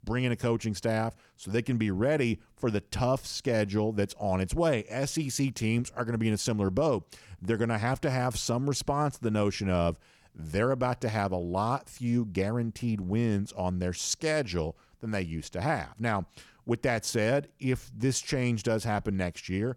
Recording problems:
none

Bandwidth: 18 kHz